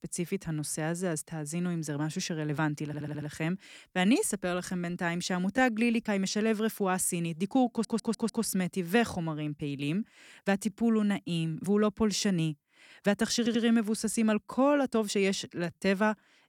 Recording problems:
uneven, jittery; strongly; from 2.5 to 16 s
audio stuttering; at 3 s, at 7.5 s and at 13 s

